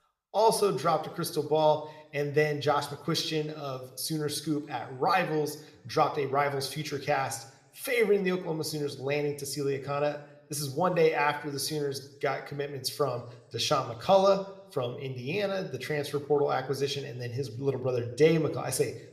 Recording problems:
room echo; very slight; dies away in 0.6 s

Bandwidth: 14.5 kHz